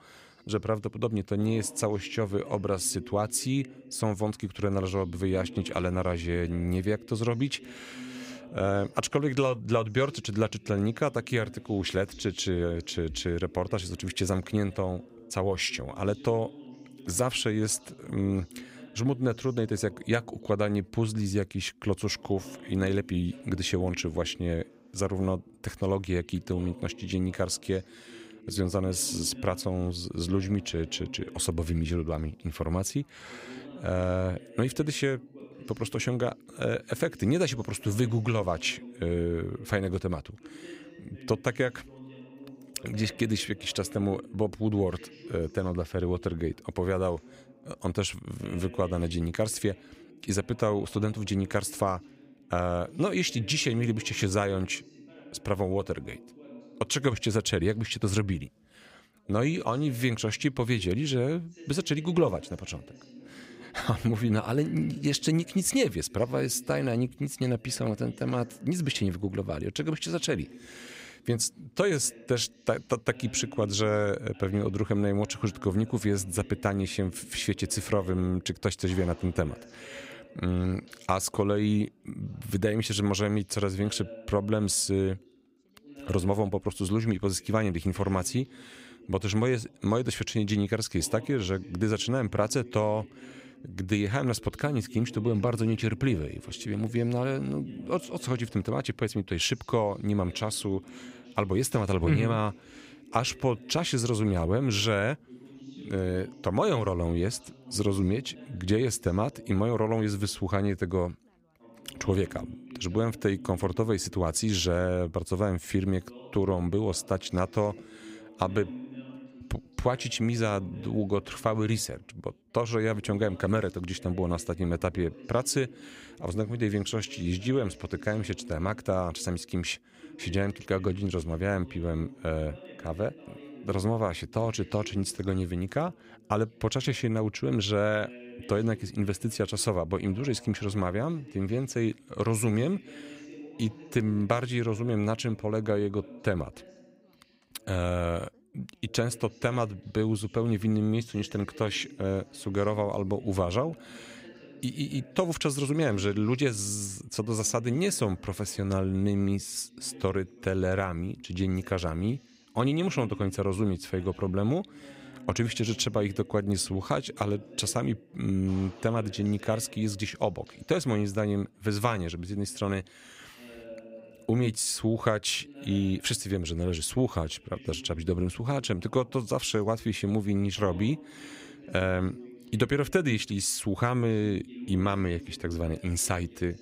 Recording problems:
background chatter; noticeable; throughout; 2 voices, 20 dB below the speech

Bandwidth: 15.5 kHz